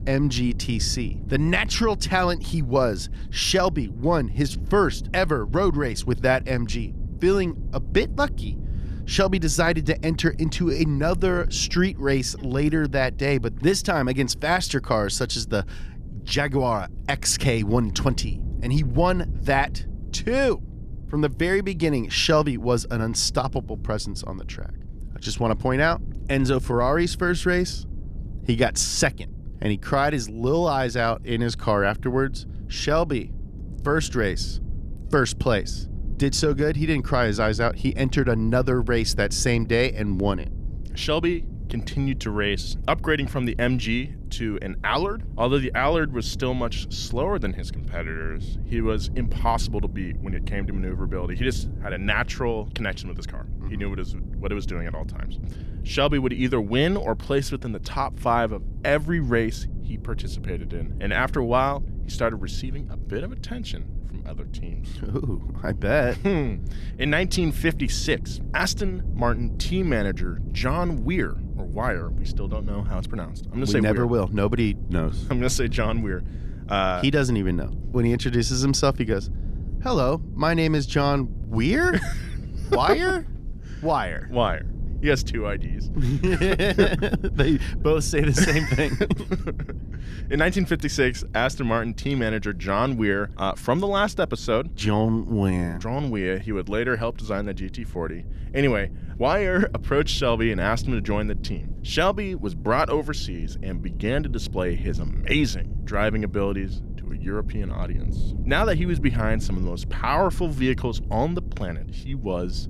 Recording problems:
low rumble; faint; throughout; 20 dB below the speech

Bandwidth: 14.5 kHz